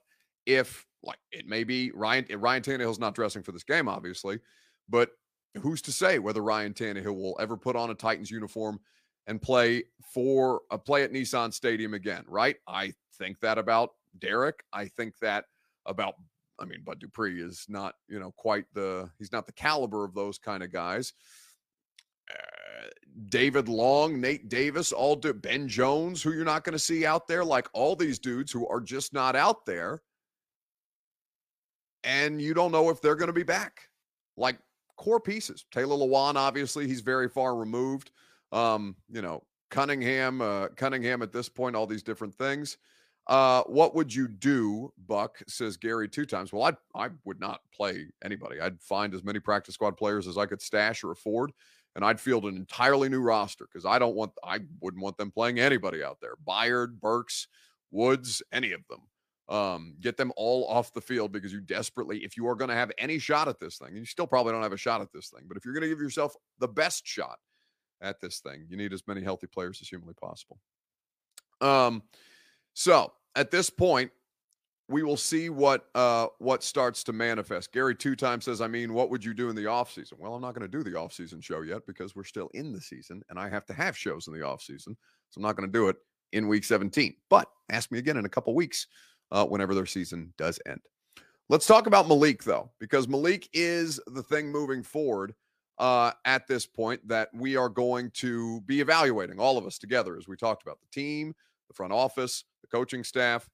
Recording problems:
none

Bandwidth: 15 kHz